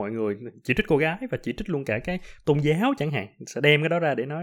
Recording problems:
abrupt cut into speech; at the start and the end

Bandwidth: 17.5 kHz